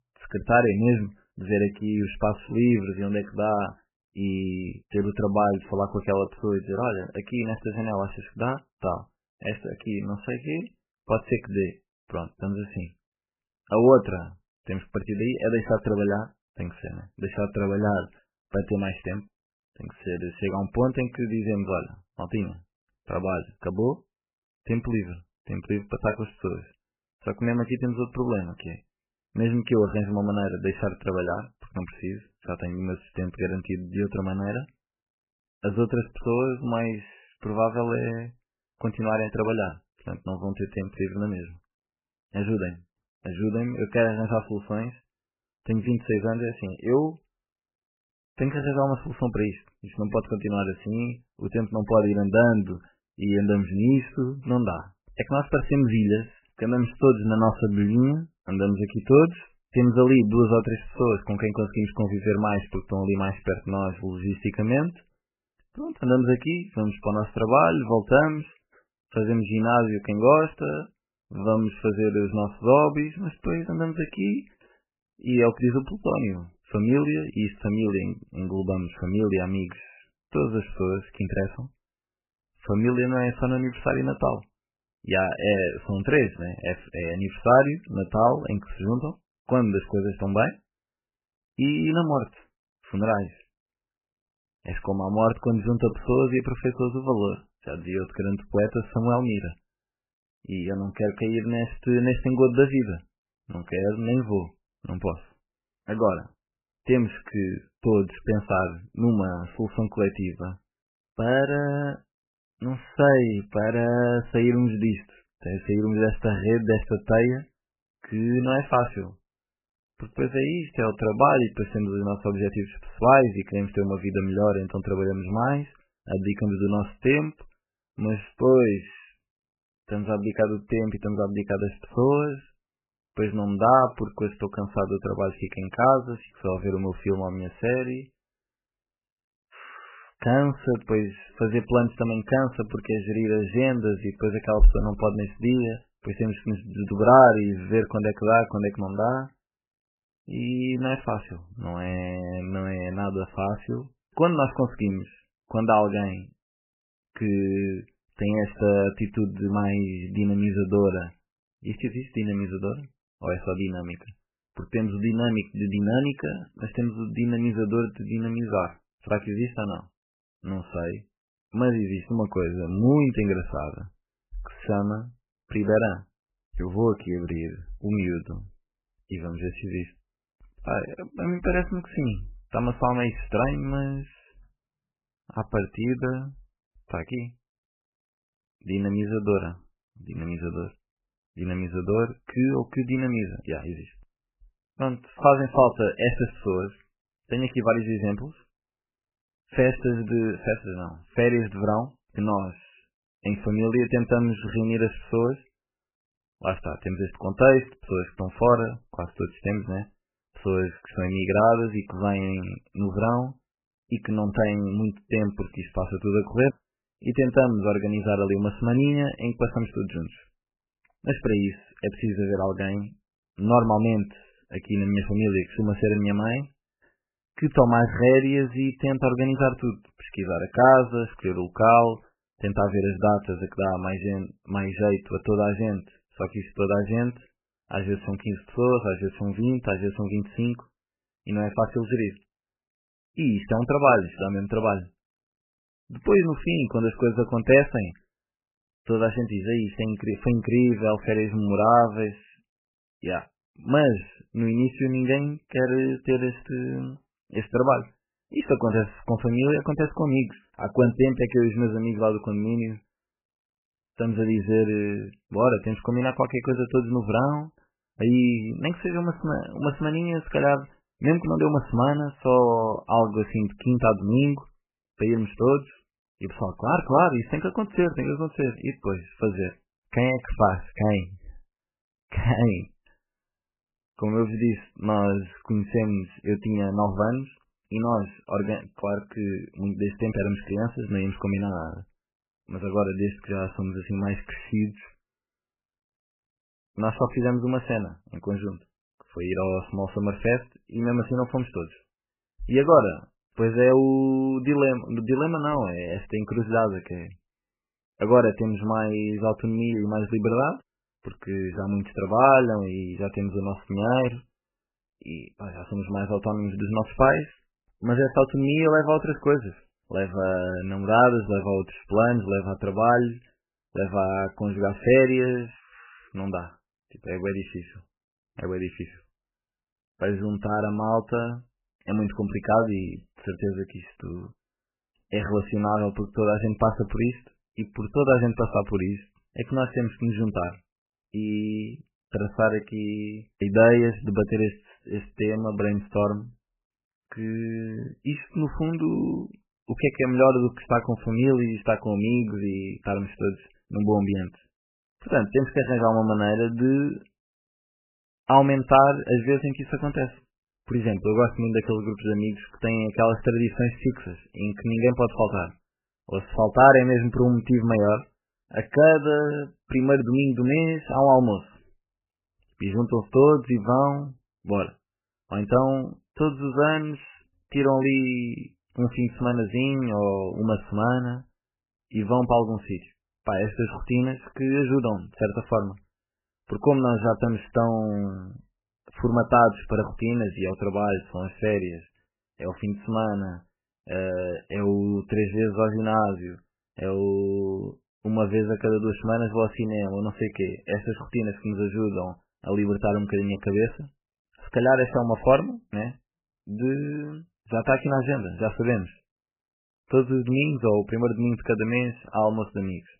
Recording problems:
garbled, watery; badly; nothing above 3 kHz

